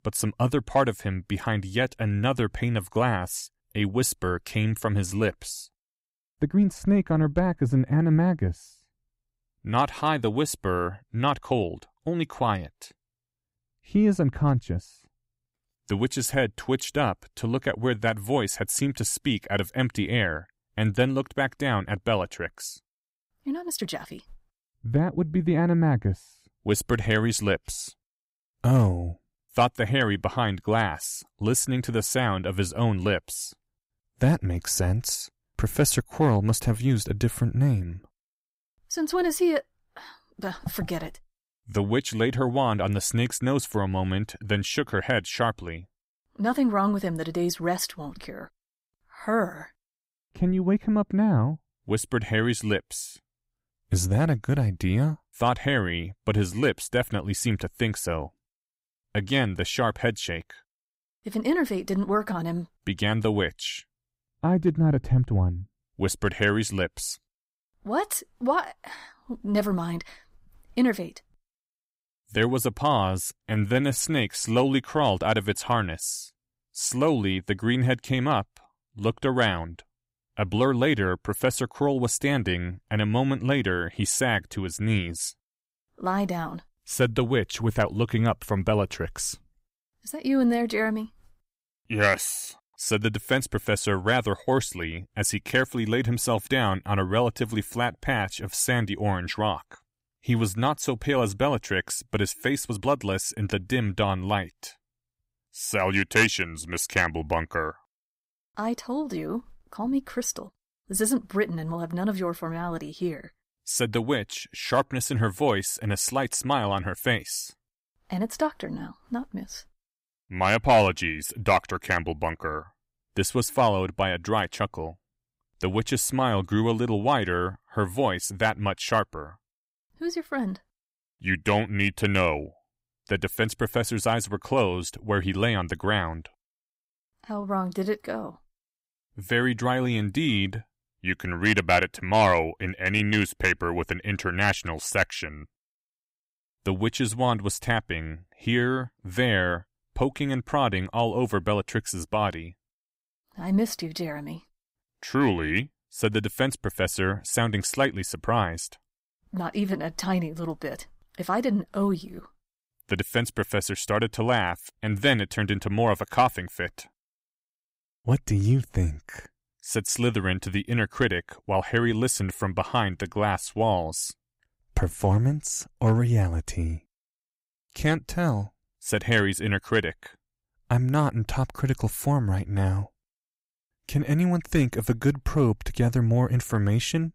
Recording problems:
uneven, jittery; strongly; from 6.5 s to 2:54

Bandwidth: 15.5 kHz